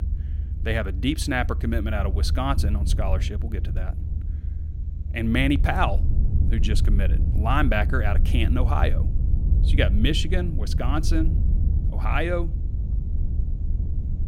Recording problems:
low rumble; noticeable; throughout; 15 dB below the speech

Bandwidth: 16.5 kHz